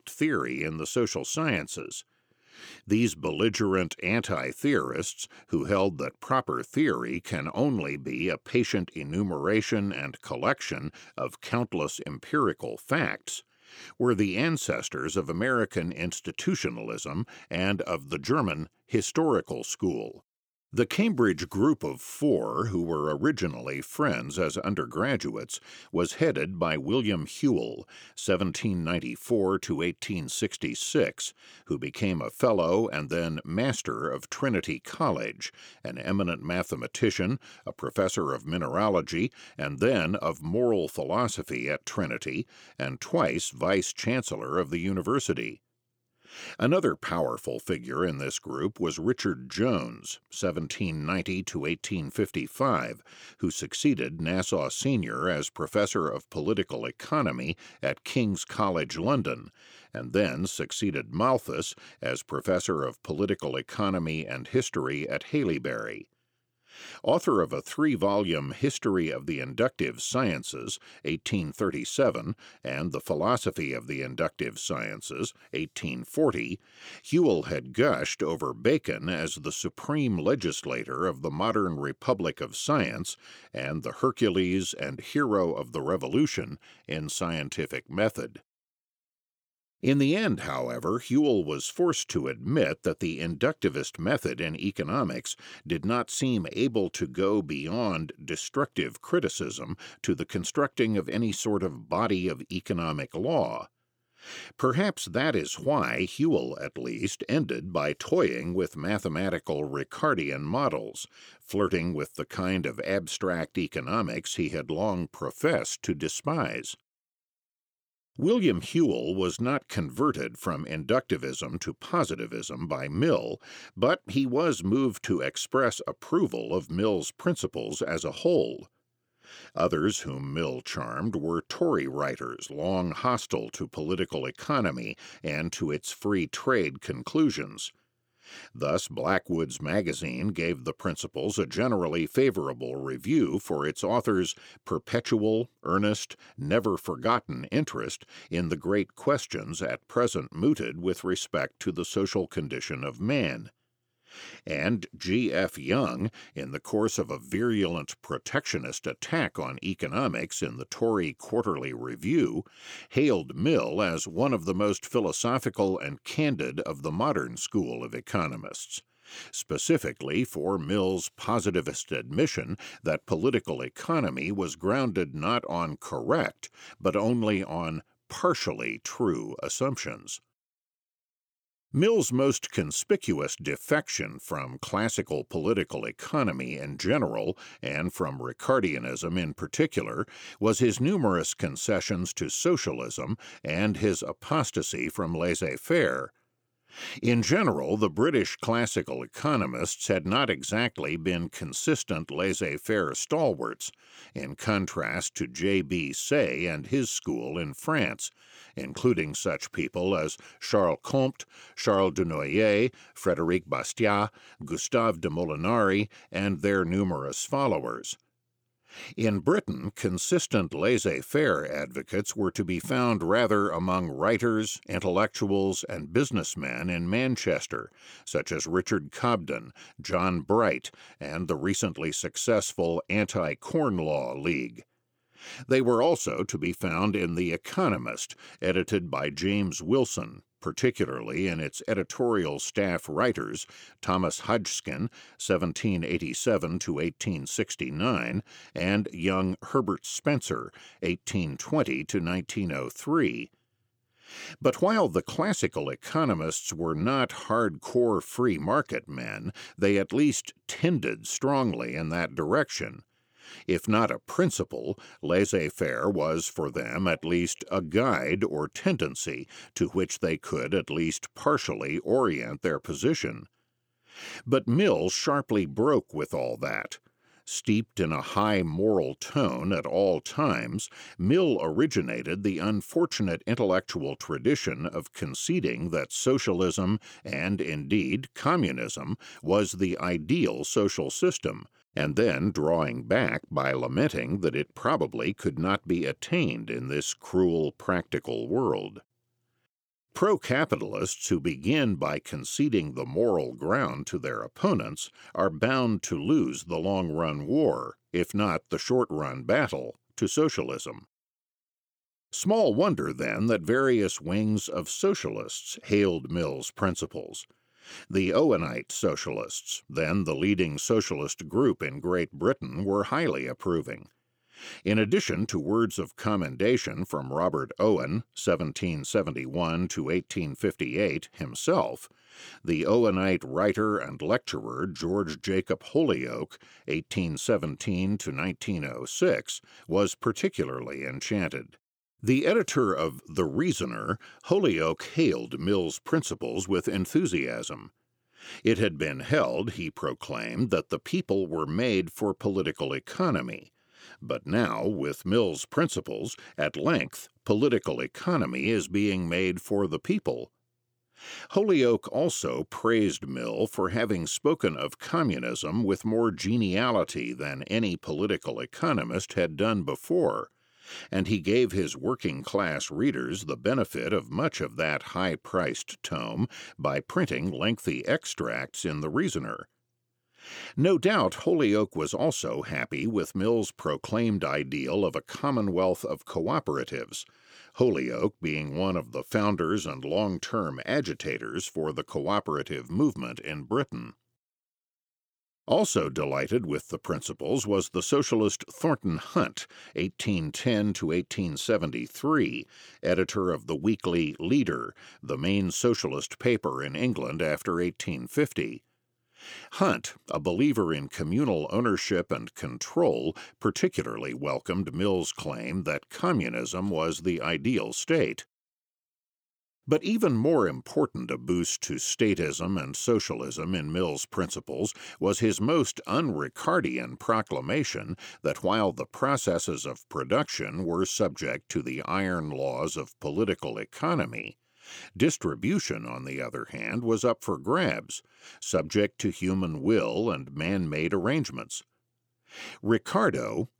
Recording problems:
none

